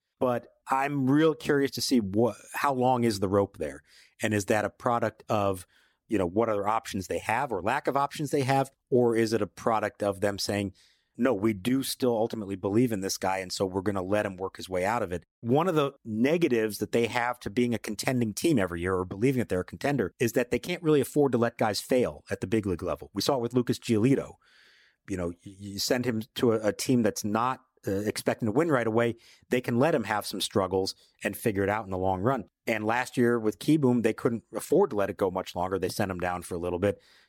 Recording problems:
none

